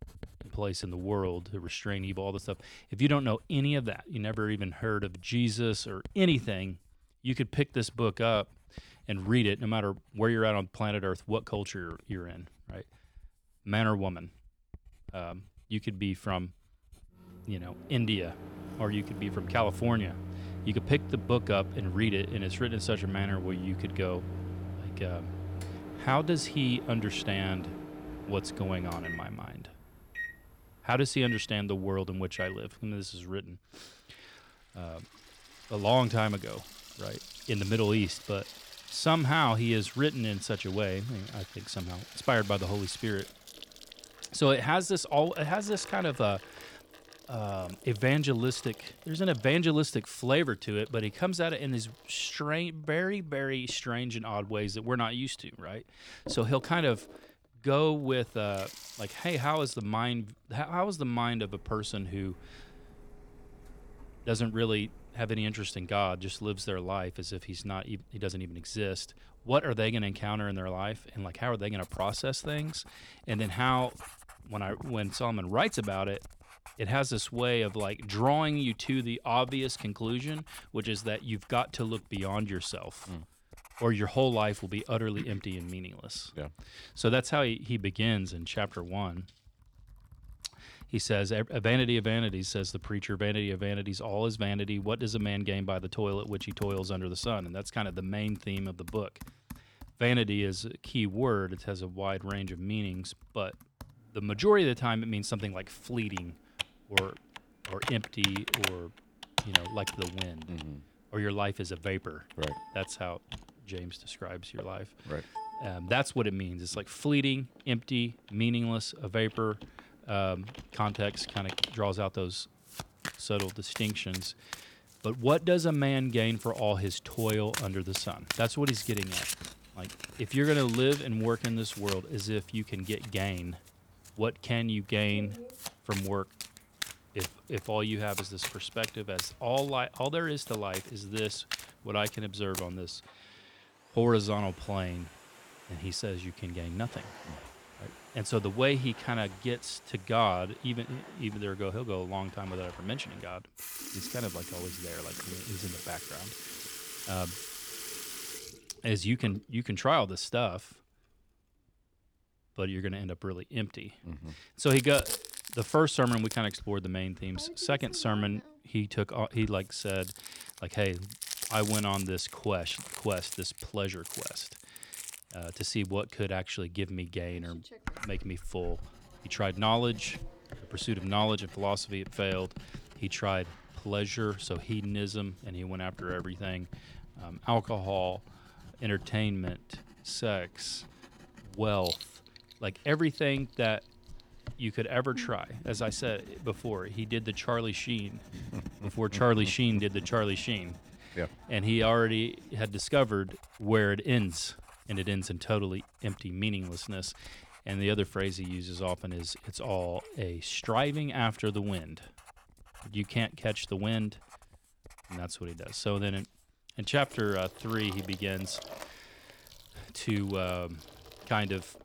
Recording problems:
household noises; noticeable; throughout; 10 dB below the speech

